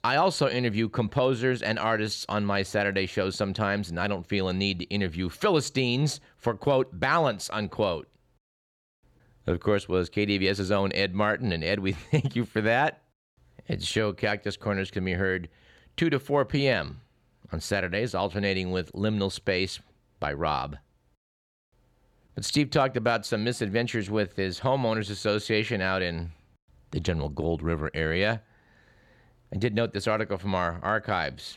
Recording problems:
none

